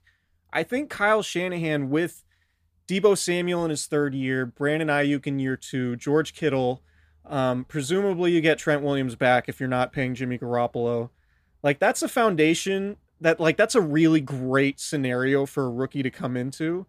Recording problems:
none

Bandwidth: 15 kHz